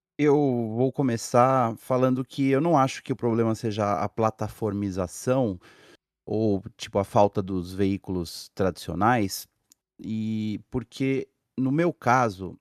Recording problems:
none

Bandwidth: 13.5 kHz